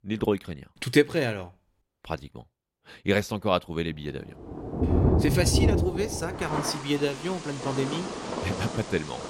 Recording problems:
rain or running water; loud; from 4.5 s on; as loud as the speech

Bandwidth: 16 kHz